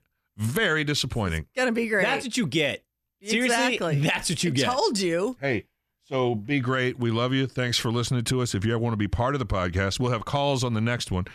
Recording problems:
none

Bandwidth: 14.5 kHz